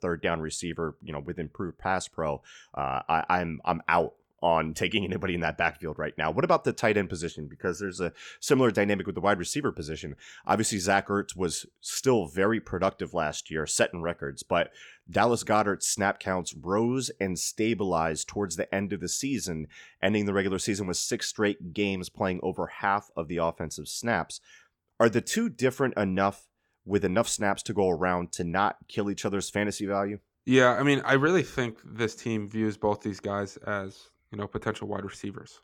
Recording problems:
none

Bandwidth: 18.5 kHz